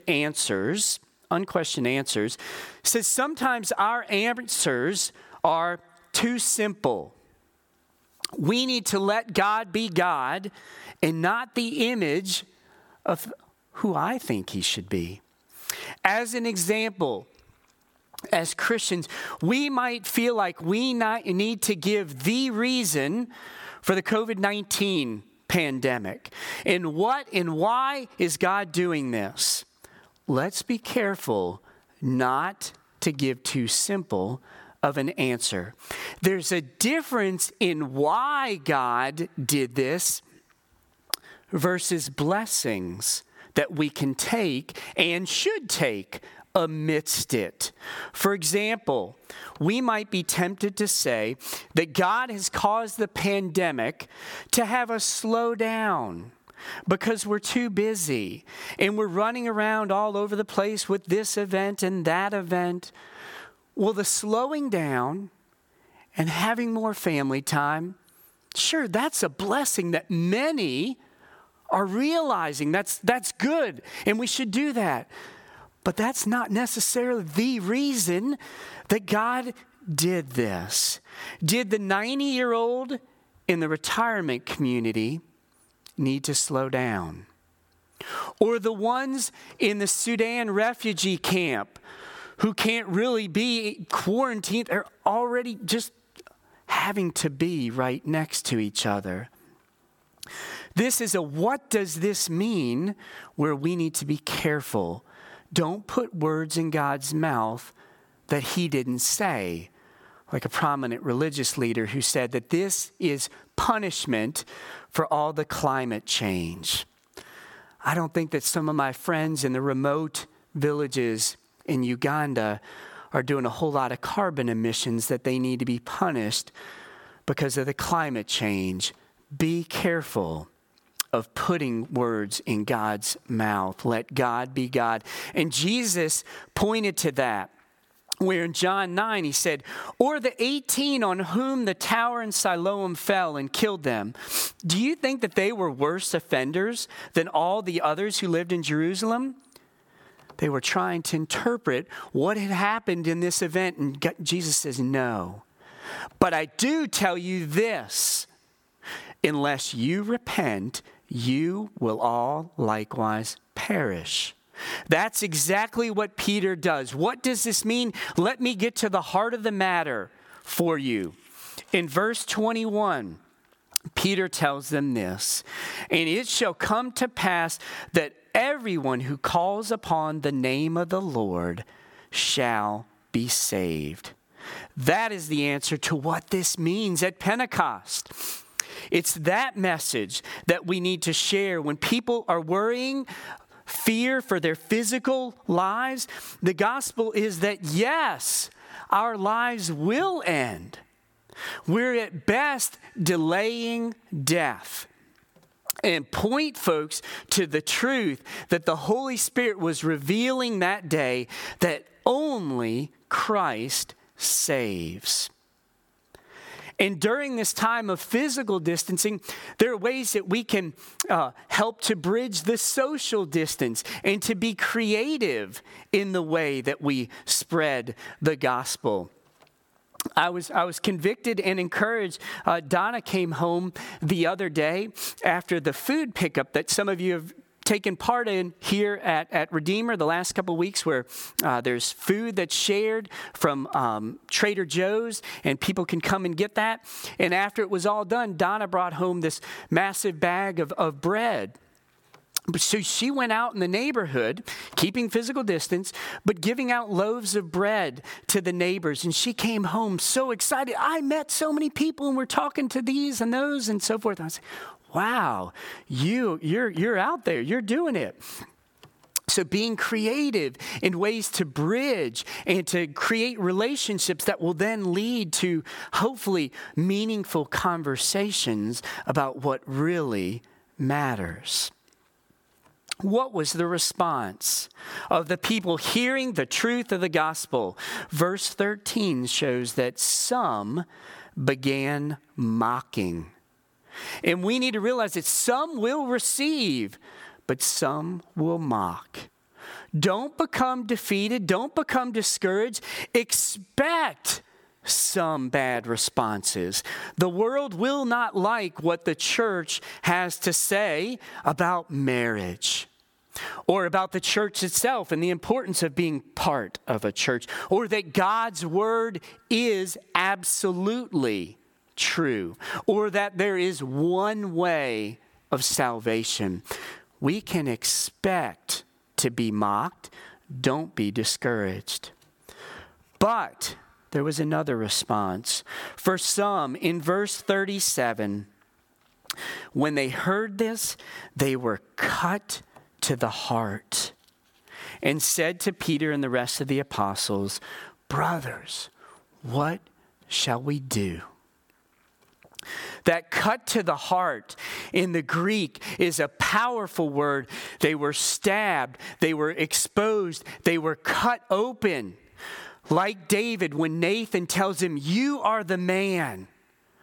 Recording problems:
squashed, flat; heavily

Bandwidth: 17.5 kHz